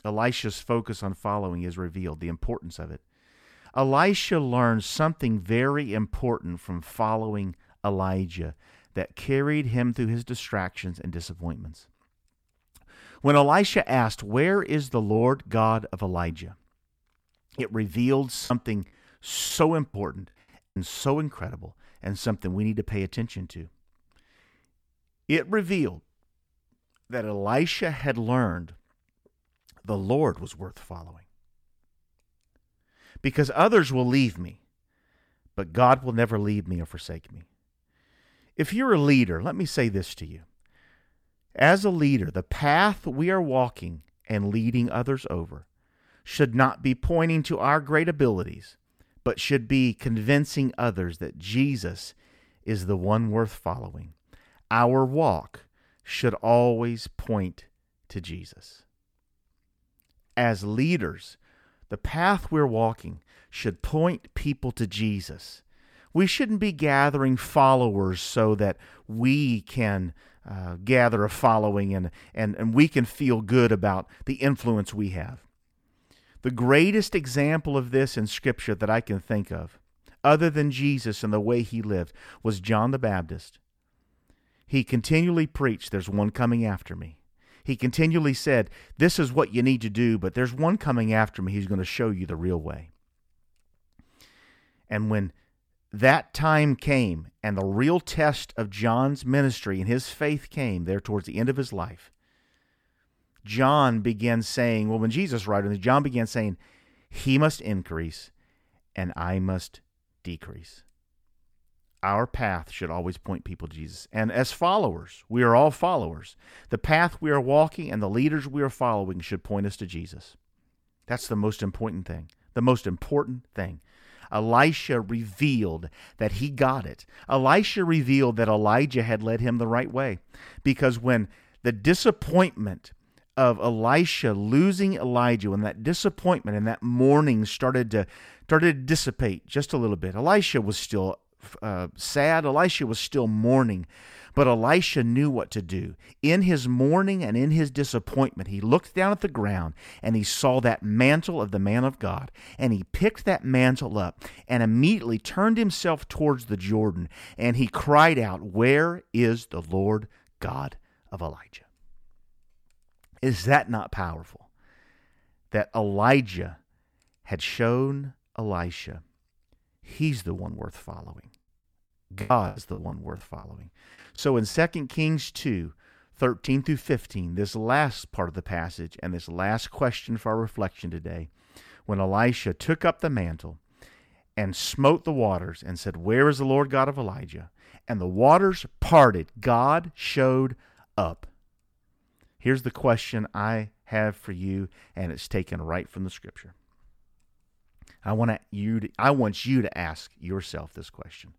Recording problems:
choppy; very; from 18 to 21 s and from 2:52 to 2:55; 12% of the speech affected

